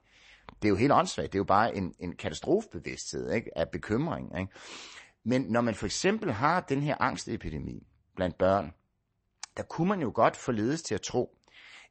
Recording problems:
garbled, watery; slightly; nothing above 8 kHz

